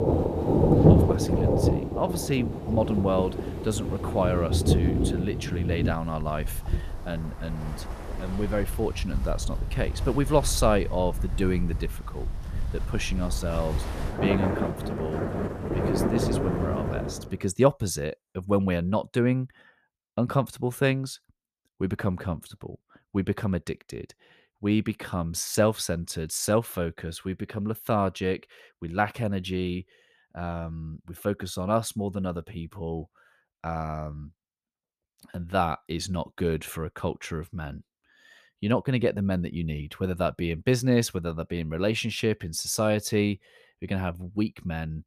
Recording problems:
rain or running water; very loud; until 17 s; 1 dB above the speech

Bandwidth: 14.5 kHz